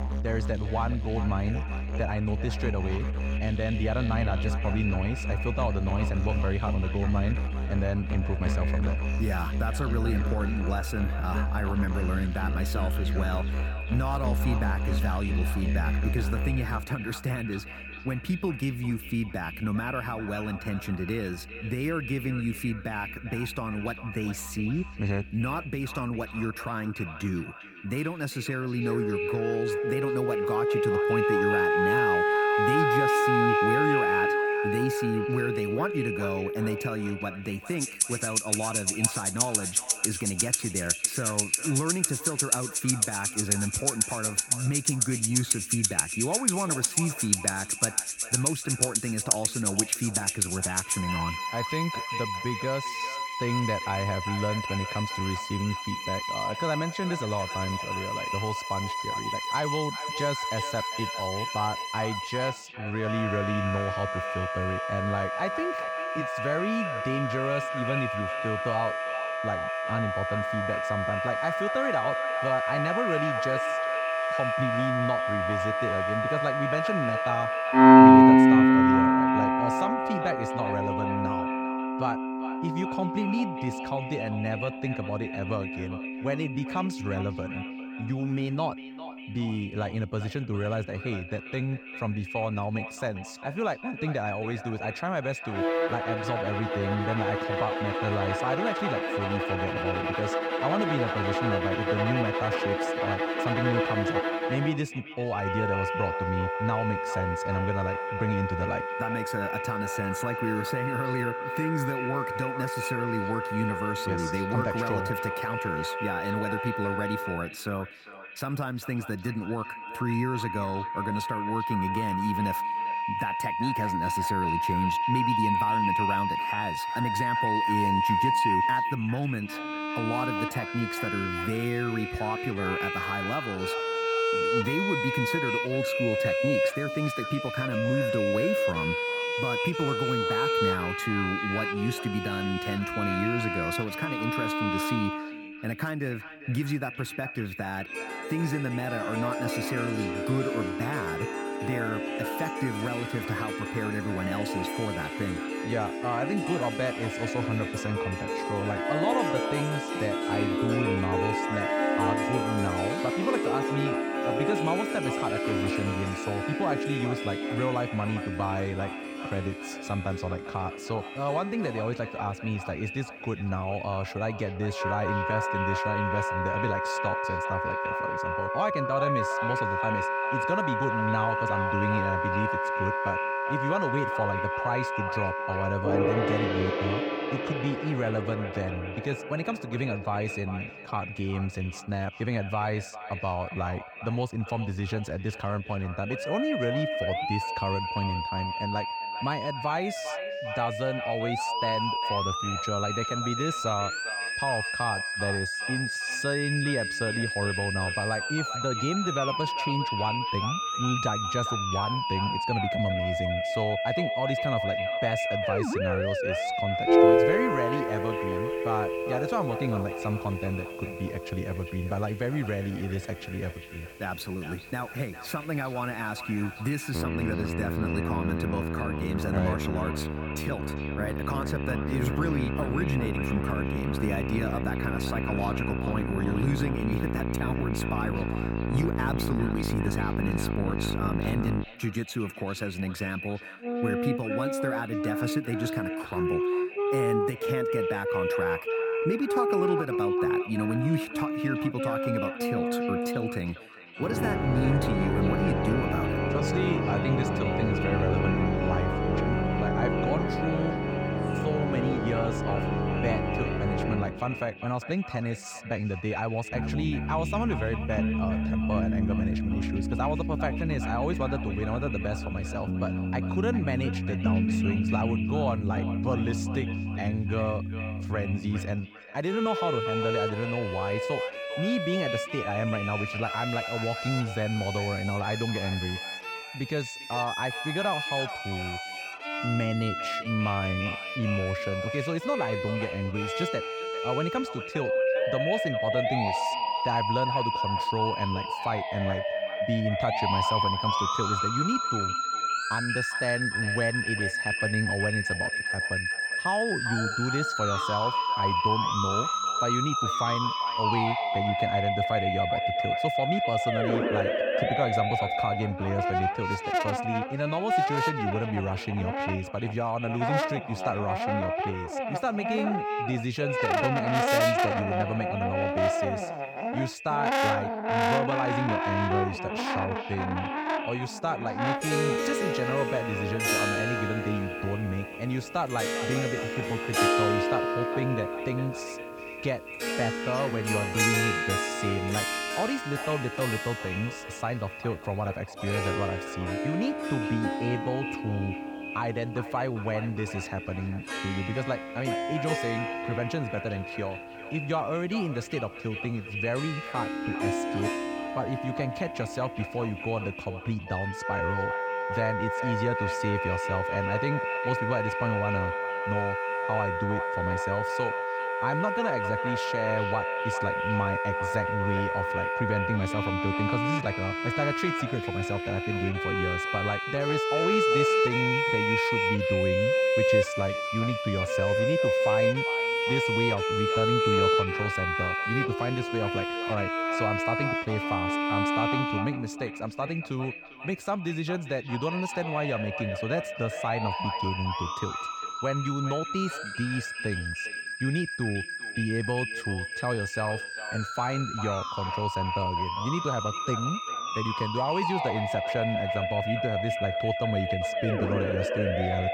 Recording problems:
echo of what is said; strong; throughout; 400 ms later, 9 dB below the speech
background music; very loud; throughout; 3 dB above the speech

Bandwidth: 18 kHz